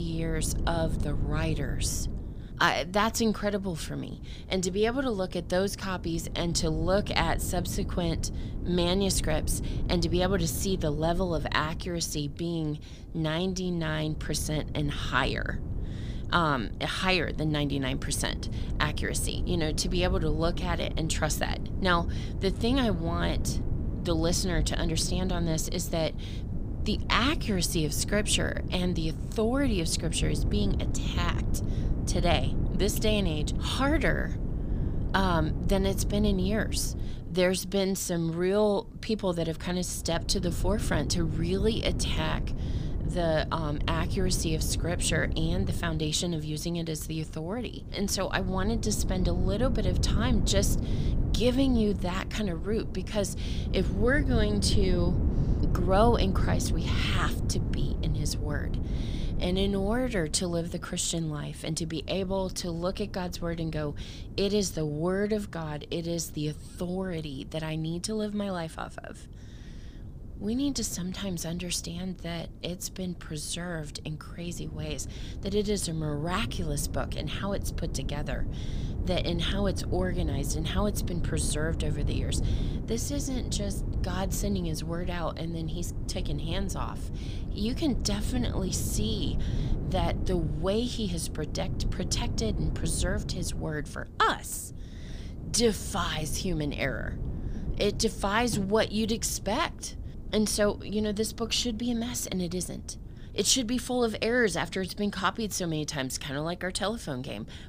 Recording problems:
wind noise on the microphone; occasional gusts; 15 dB below the speech
abrupt cut into speech; at the start

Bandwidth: 15 kHz